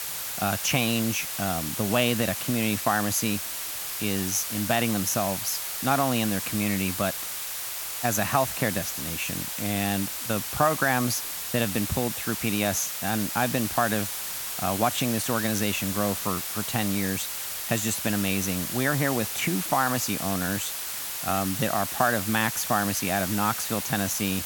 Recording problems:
hiss; loud; throughout; 3 dB below the speech

